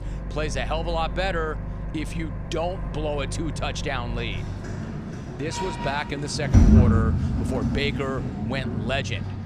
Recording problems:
household noises; very loud; throughout; 3 dB above the speech

